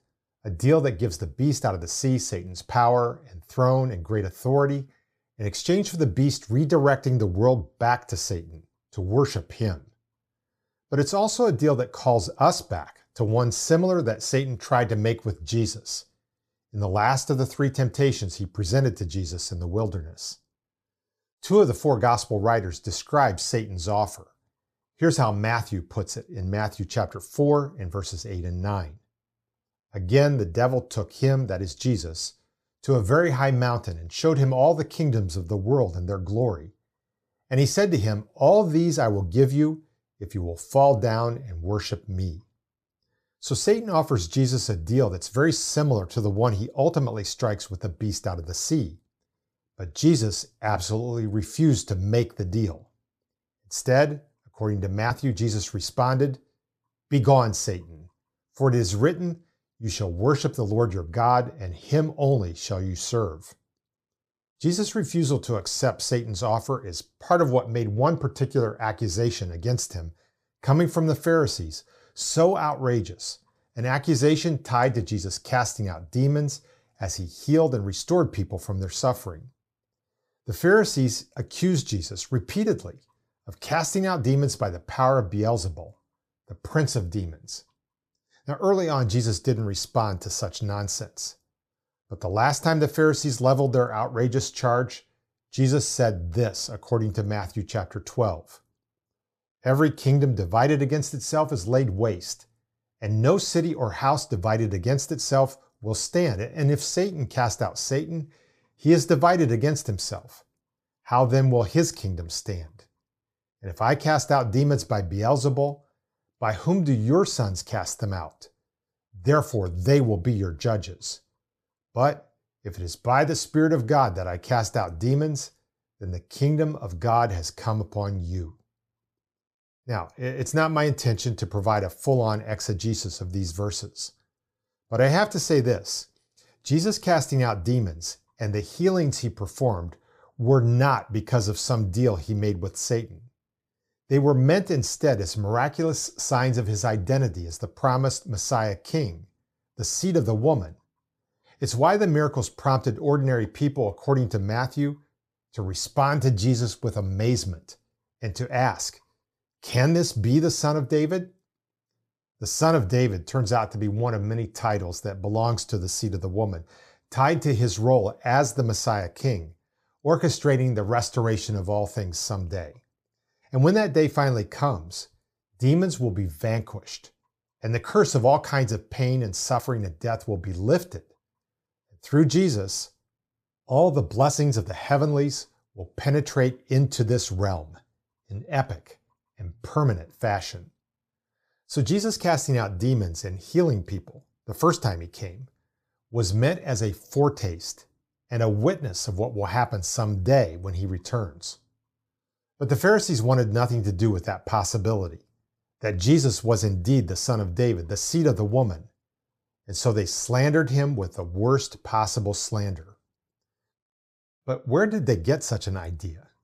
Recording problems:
none

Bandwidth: 15 kHz